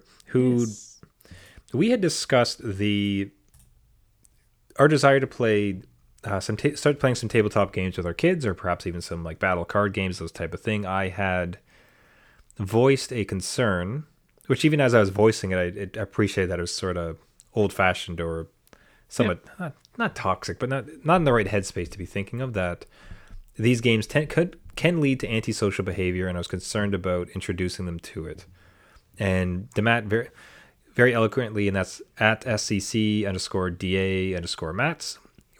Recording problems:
none

